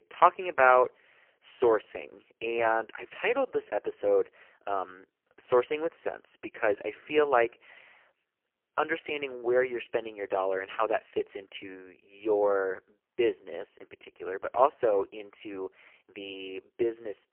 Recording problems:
phone-call audio; poor line; nothing above 3 kHz

